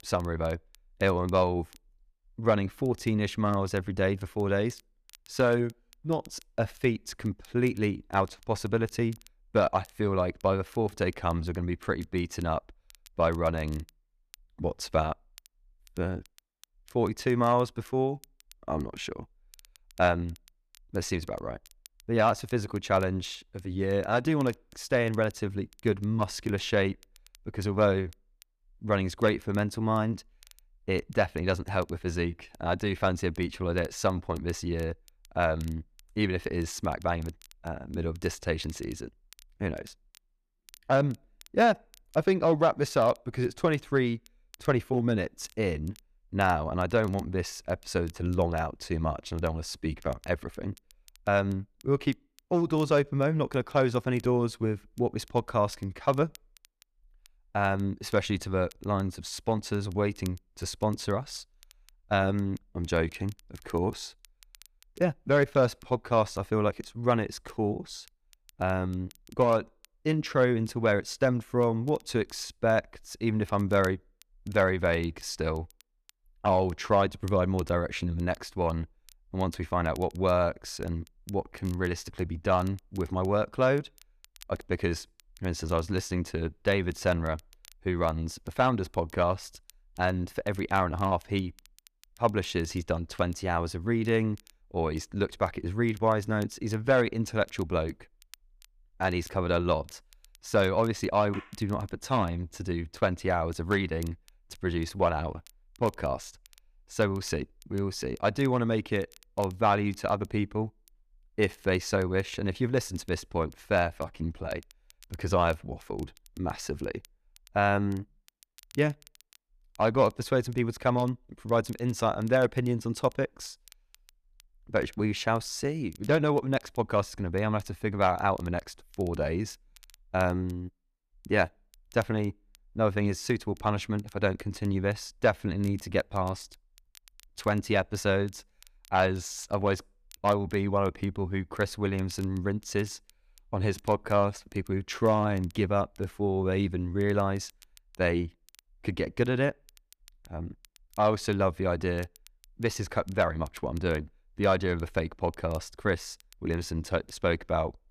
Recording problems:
crackle, like an old record; faint; 30 dB below the speech

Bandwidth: 14.5 kHz